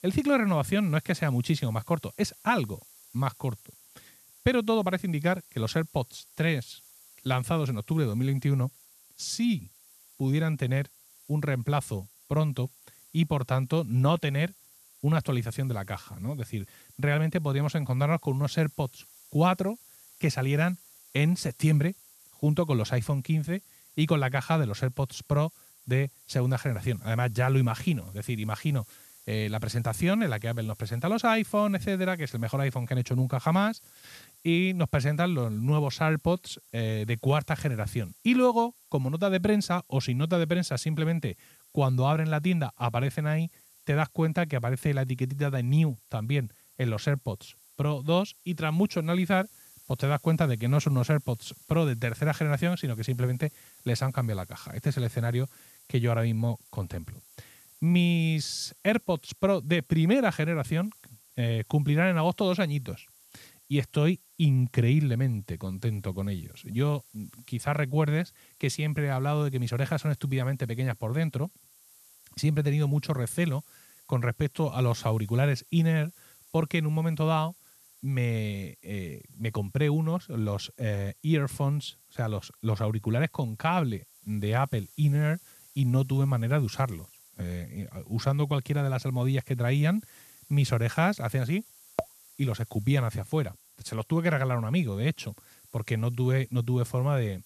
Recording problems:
hiss; faint; throughout; 25 dB below the speech

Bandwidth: 13.5 kHz